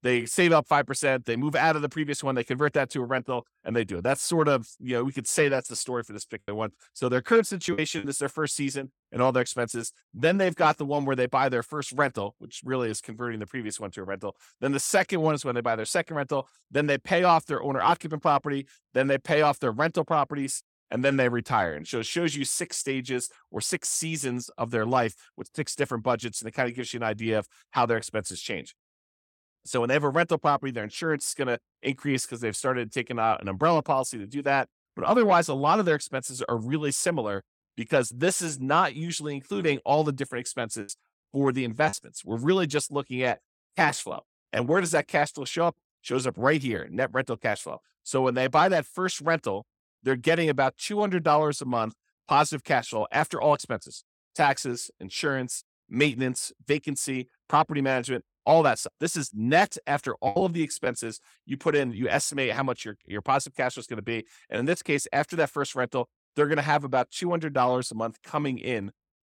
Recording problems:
choppy; very; from 6.5 to 8 s, from 41 to 42 s and at 1:00; 10% of the speech affected

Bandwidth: 17 kHz